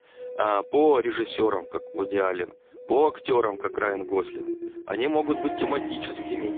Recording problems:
phone-call audio; poor line
background music; noticeable; throughout; 10 dB below the speech

